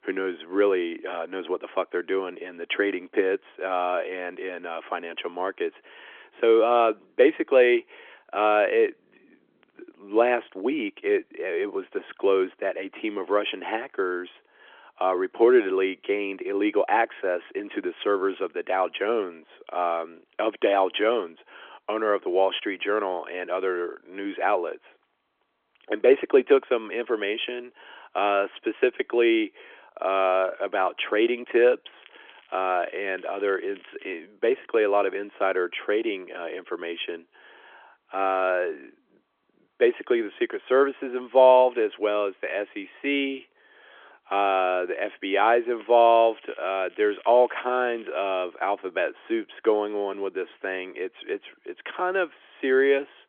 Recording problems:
phone-call audio; nothing above 3.5 kHz
crackling; faint; from 32 to 34 s and from 46 to 48 s; 25 dB below the speech

